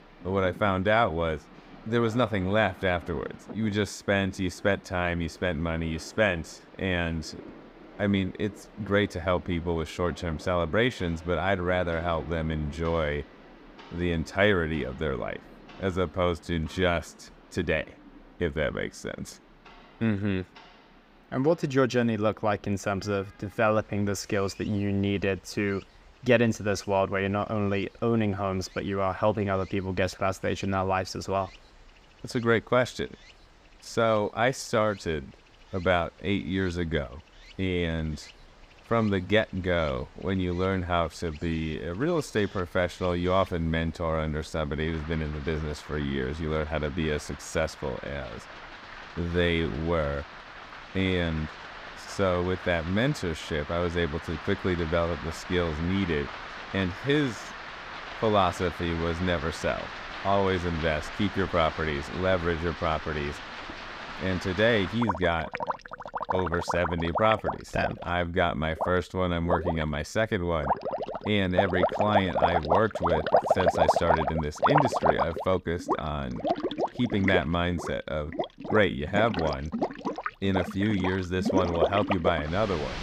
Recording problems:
rain or running water; loud; throughout; 5 dB below the speech

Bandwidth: 15.5 kHz